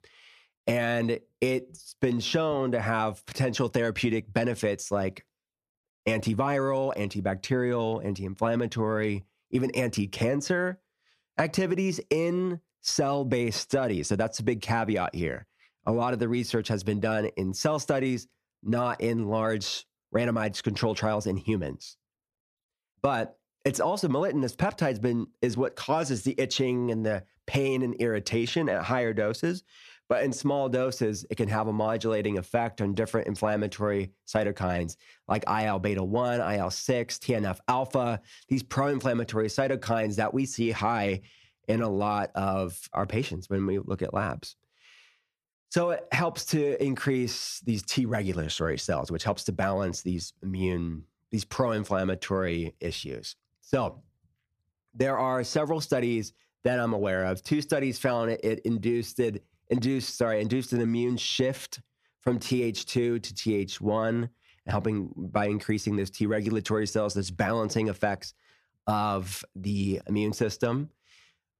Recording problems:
squashed, flat; somewhat

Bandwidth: 14 kHz